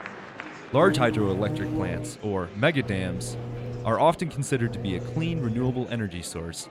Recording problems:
electrical hum; noticeable; from 1 to 2 s, from 3 to 4 s and from 4.5 to 6 s; 60 Hz, 10 dB below the speech
murmuring crowd; noticeable; throughout; 15 dB below the speech

